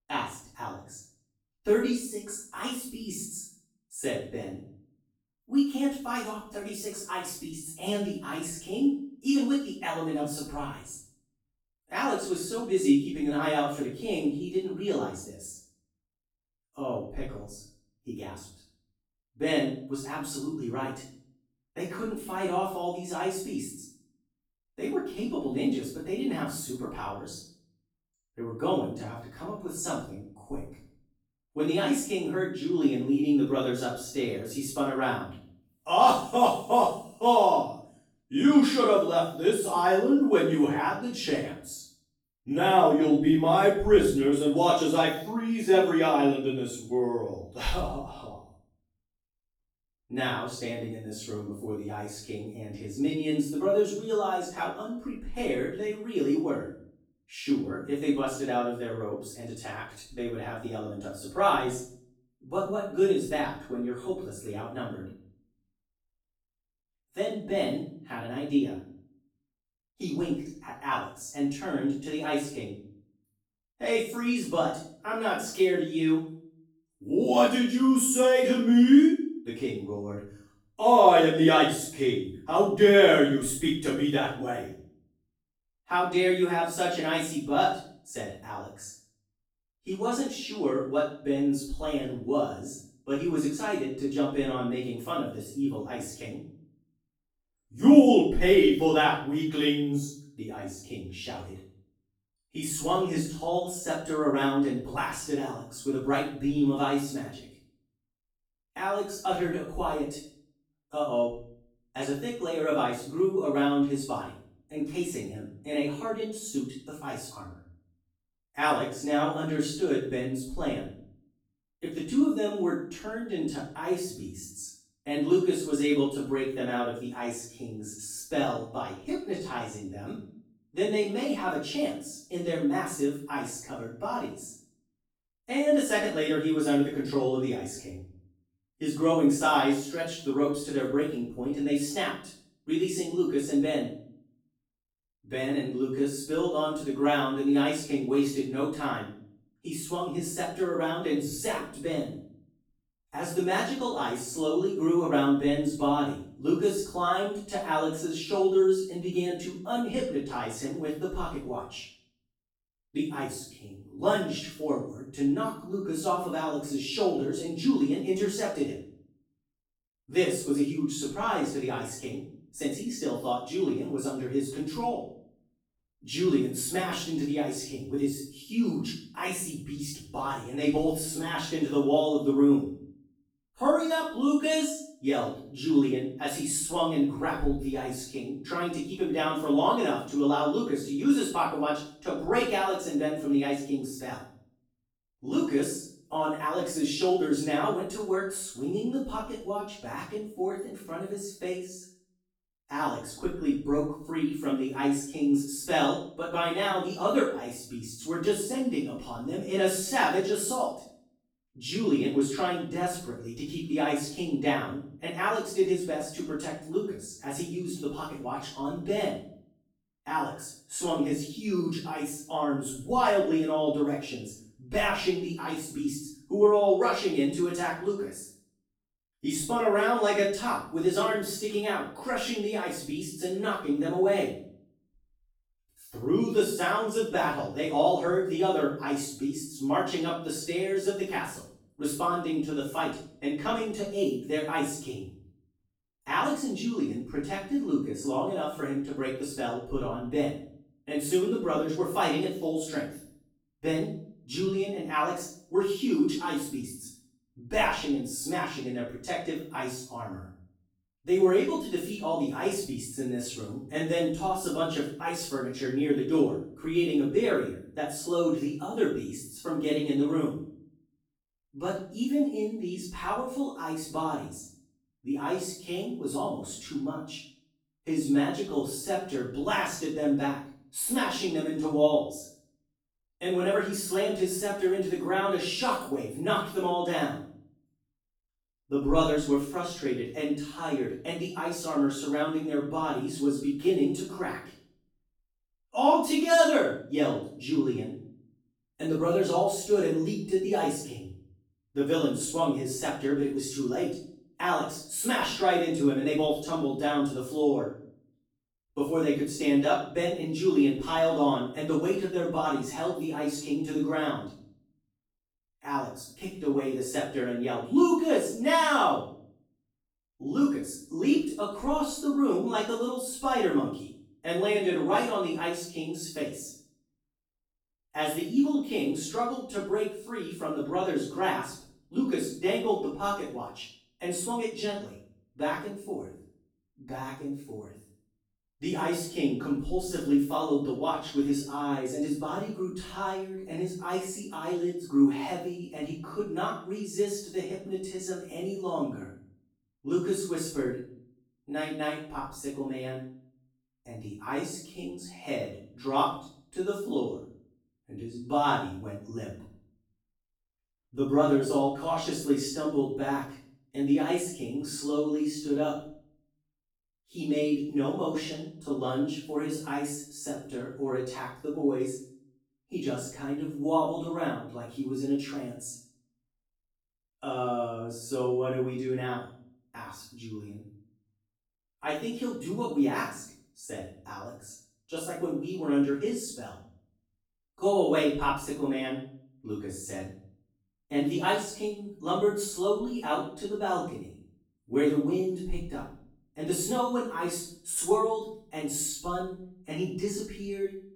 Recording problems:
off-mic speech; far
room echo; noticeable; dies away in 0.5 s

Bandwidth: 18.5 kHz